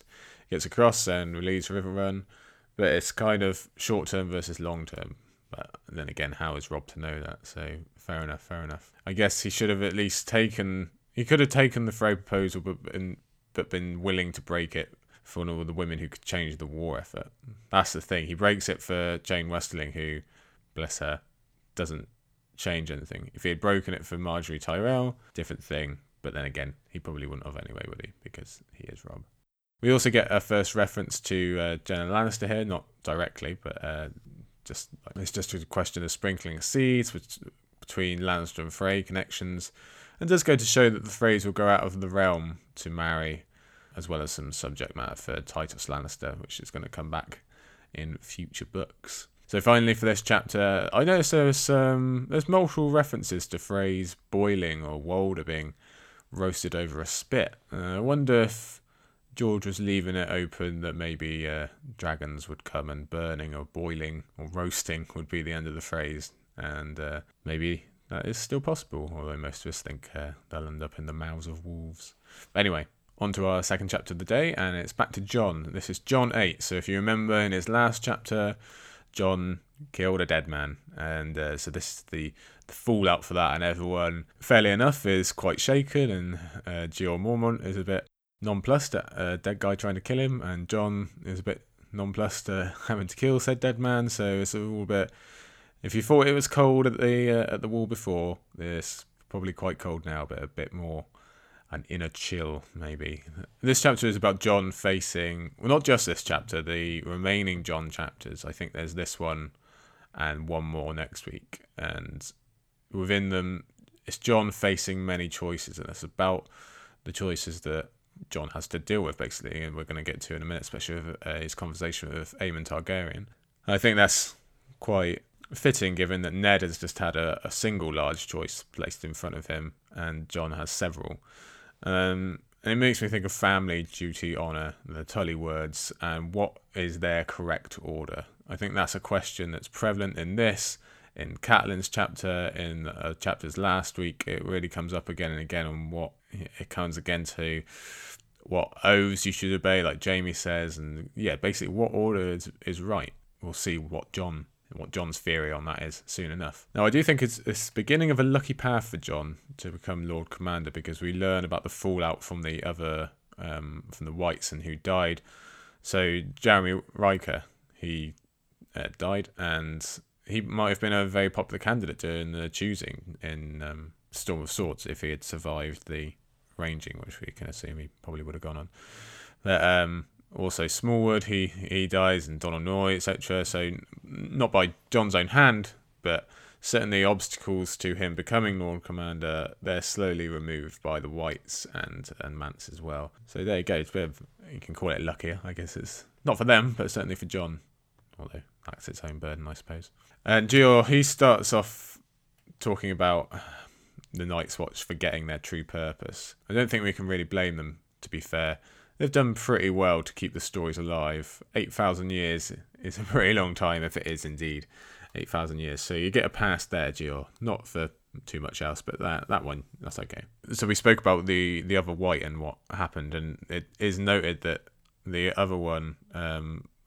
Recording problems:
none

